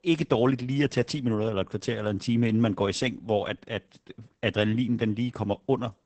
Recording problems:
garbled, watery; badly; nothing above 8 kHz

